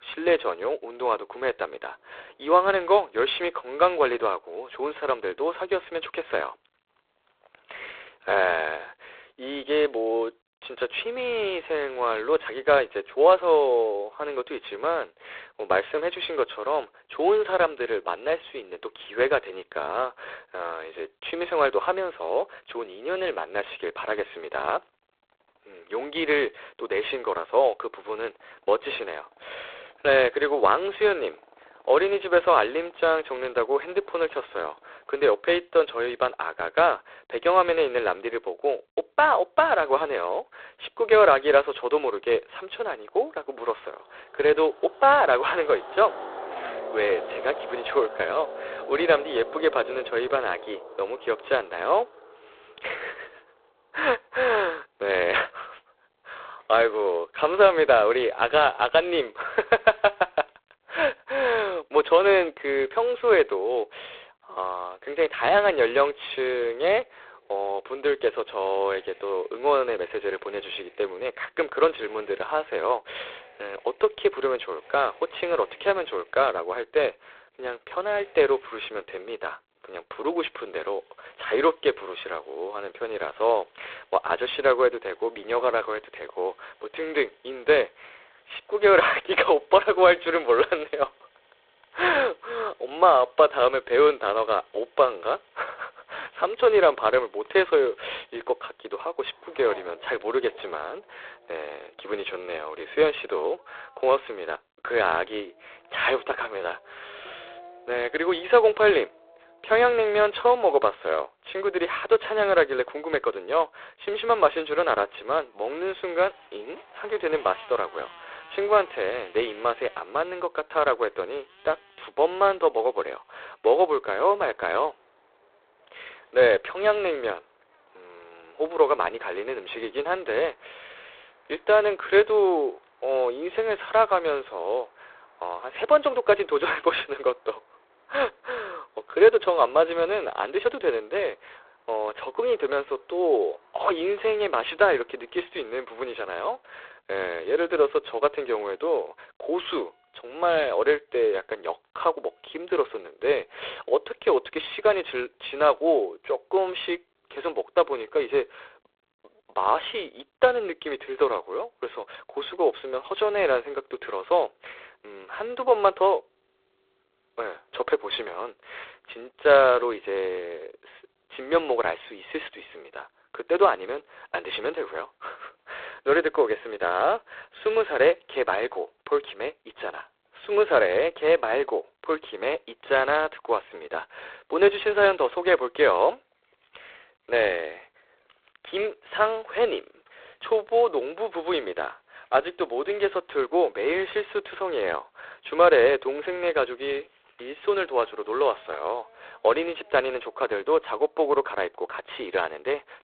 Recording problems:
phone-call audio; poor line; nothing above 3.5 kHz
traffic noise; faint; throughout; 20 dB below the speech

